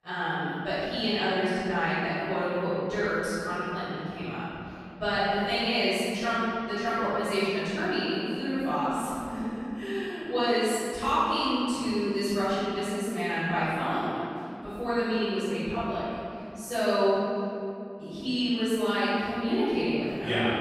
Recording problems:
room echo; strong; dies away in 2.6 s
off-mic speech; far

